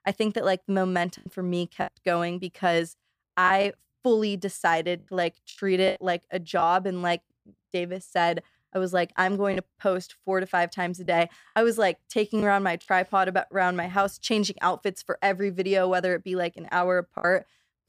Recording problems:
choppy; occasionally; 5% of the speech affected

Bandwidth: 15 kHz